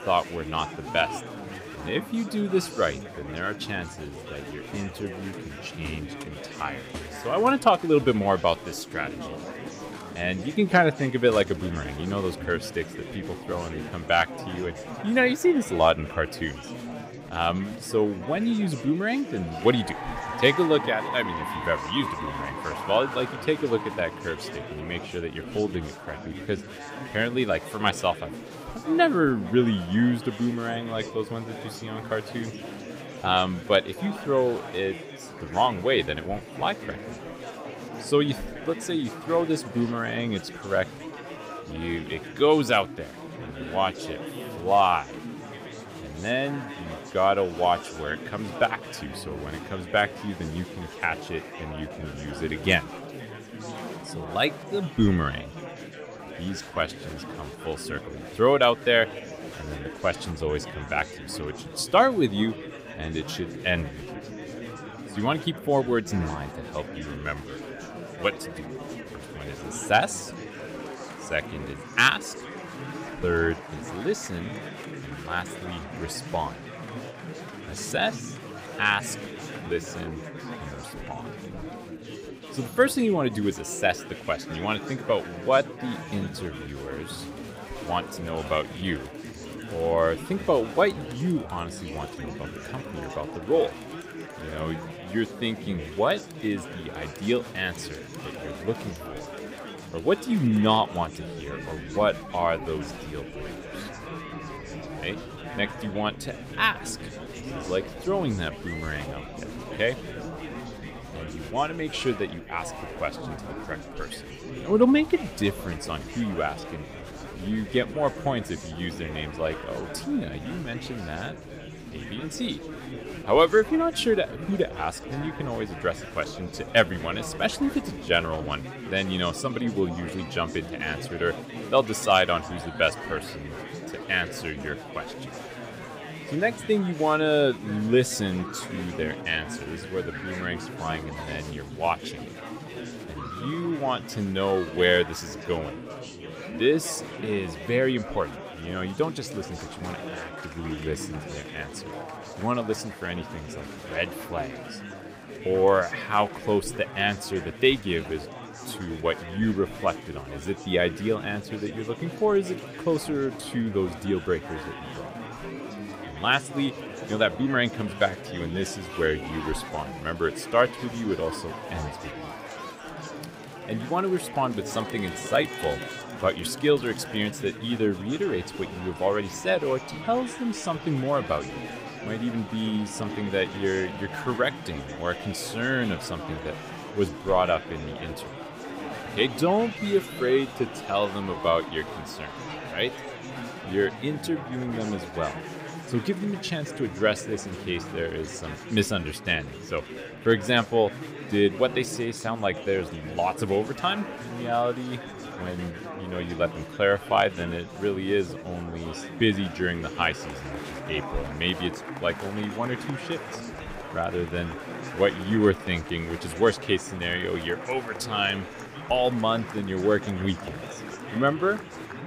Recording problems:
chatter from many people; noticeable; throughout; 10 dB below the speech

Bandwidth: 15.5 kHz